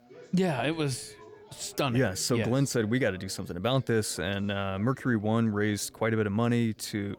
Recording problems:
background chatter; faint; throughout; 3 voices, 25 dB below the speech

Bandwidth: 19 kHz